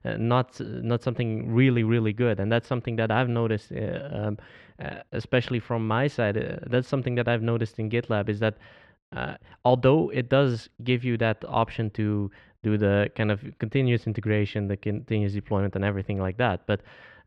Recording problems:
muffled; very; fading above 2 kHz

